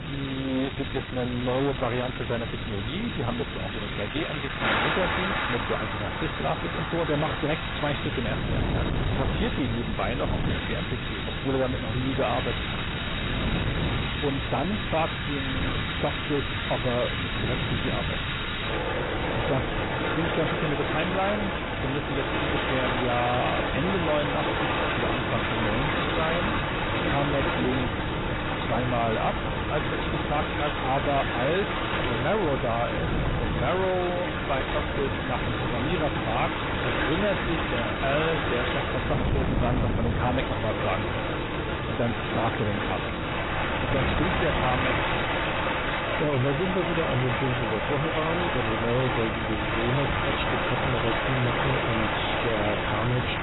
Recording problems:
garbled, watery; badly; nothing above 4 kHz
distortion; slight; 16% of the sound clipped
wind noise on the microphone; heavy; 9 dB below the speech
rain or running water; loud; throughout; as loud as the speech

